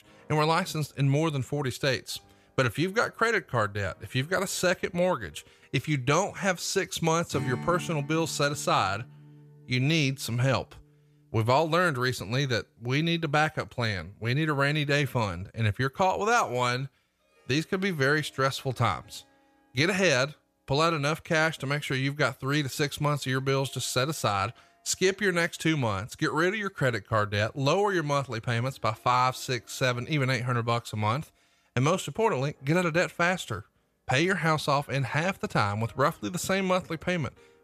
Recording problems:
background music; faint; throughout; 20 dB below the speech

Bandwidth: 14.5 kHz